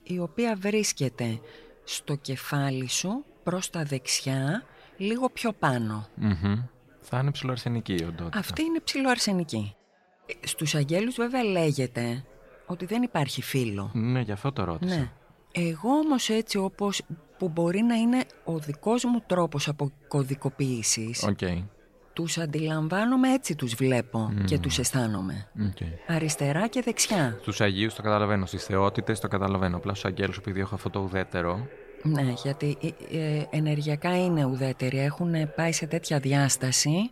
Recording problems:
background chatter; faint; throughout; 4 voices, 25 dB below the speech

